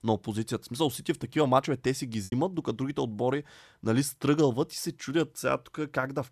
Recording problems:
choppy; occasionally; at 2 s; 3% of the speech affected

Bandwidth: 13.5 kHz